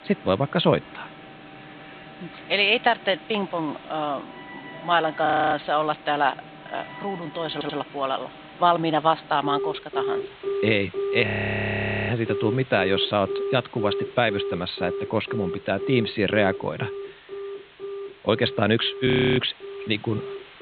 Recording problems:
high frequencies cut off; severe; nothing above 4 kHz
alarms or sirens; noticeable; throughout; 10 dB below the speech
hiss; faint; throughout; 25 dB below the speech
audio freezing; at 5.5 s, at 11 s for 1 s and at 19 s
audio stuttering; at 7.5 s

